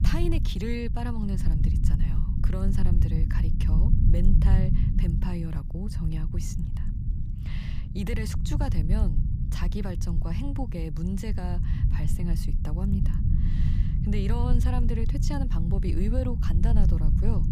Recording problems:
low rumble; loud; throughout; 3 dB below the speech

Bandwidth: 15 kHz